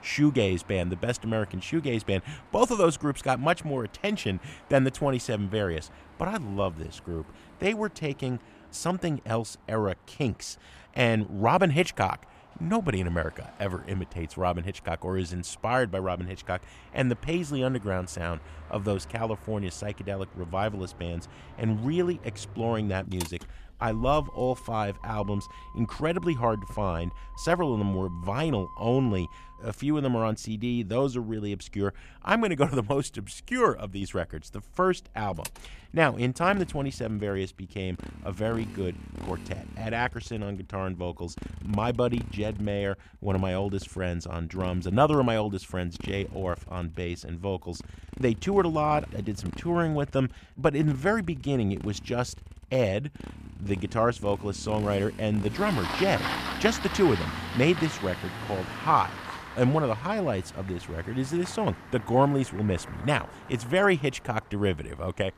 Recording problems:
traffic noise; noticeable; throughout; 15 dB below the speech

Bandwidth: 14.5 kHz